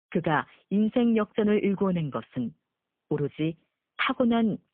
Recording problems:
phone-call audio; poor line

